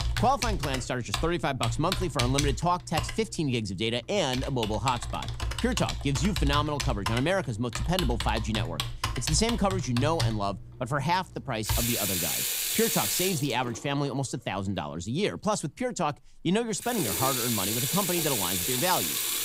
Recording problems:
household noises; loud; throughout; 1 dB below the speech

